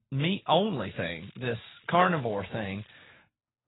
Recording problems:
garbled, watery; badly; nothing above 3.5 kHz
crackling; faint; from 1 to 3 s; 25 dB below the speech

